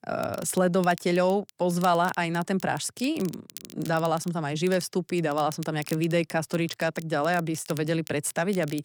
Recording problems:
crackle, like an old record; noticeable; 20 dB below the speech

